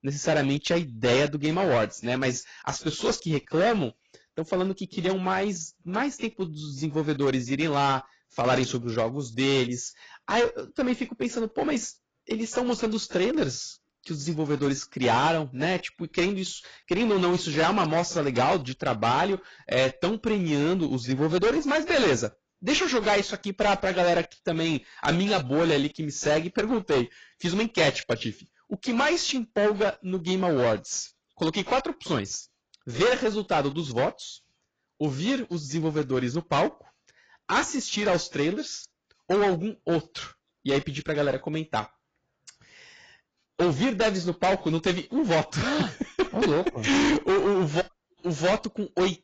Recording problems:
distortion; heavy; 11% of the sound clipped
garbled, watery; badly; nothing above 7.5 kHz

